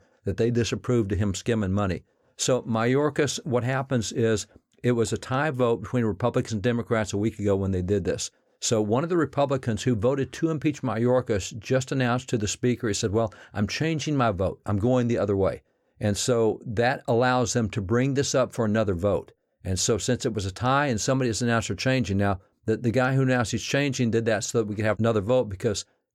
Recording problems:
none

